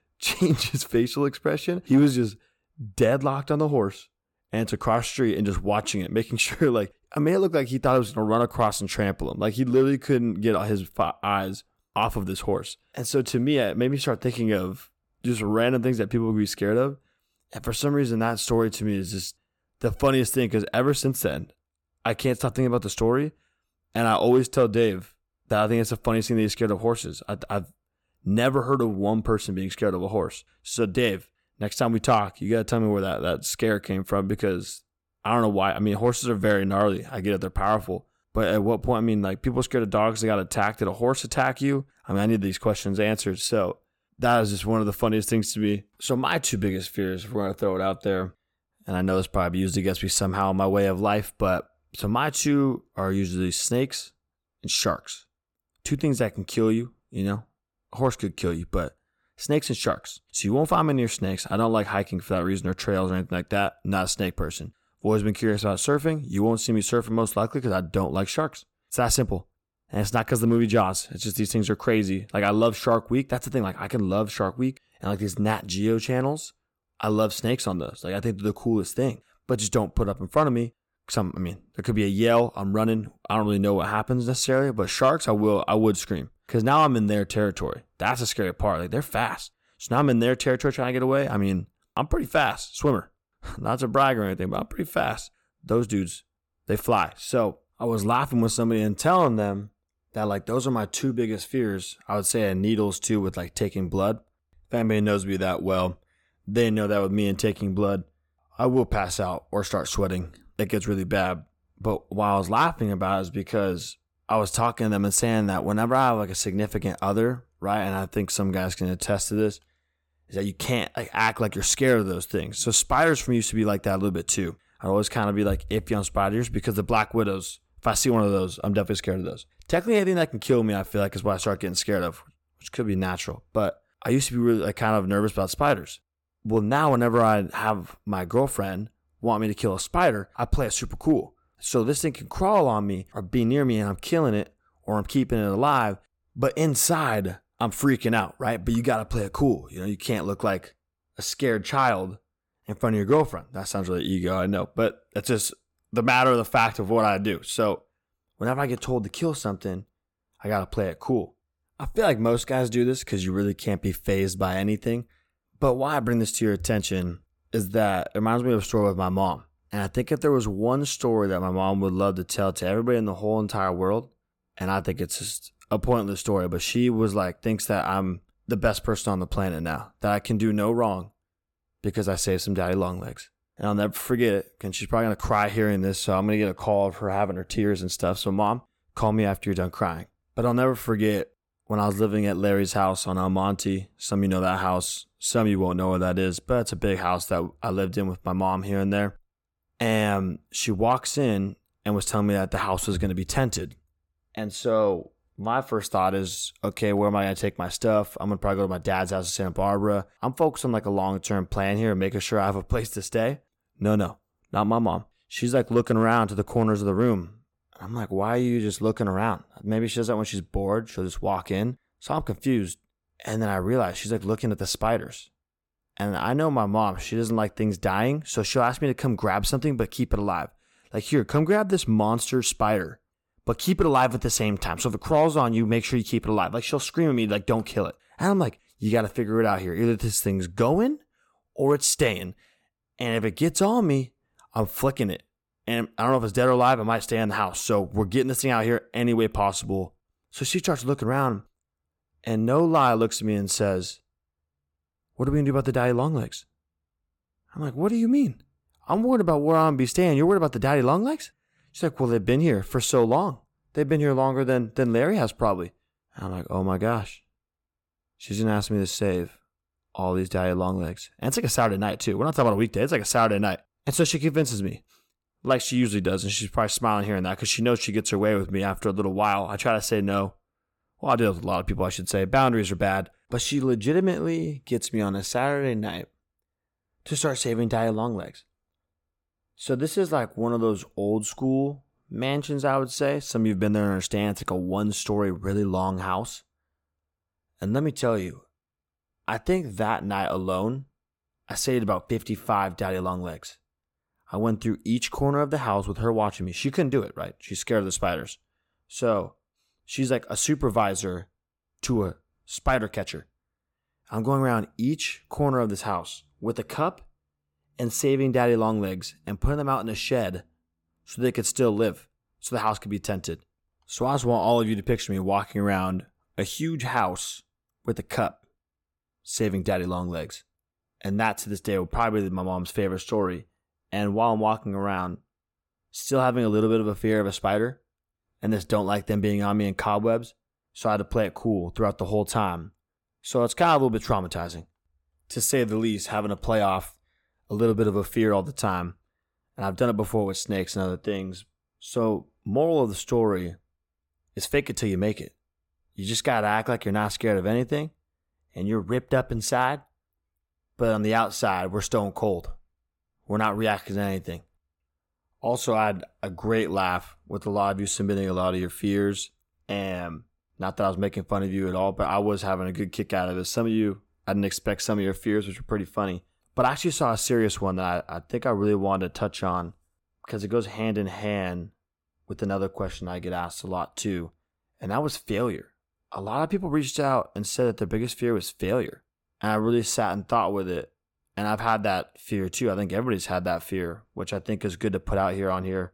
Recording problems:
none

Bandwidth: 17.5 kHz